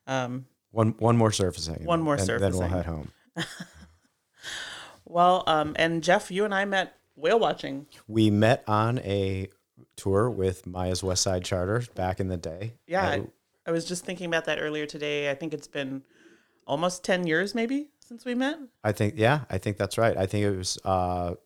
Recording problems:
none

